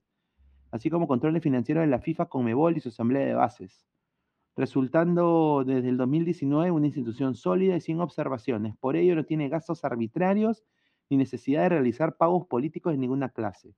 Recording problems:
muffled; slightly; fading above 3 kHz

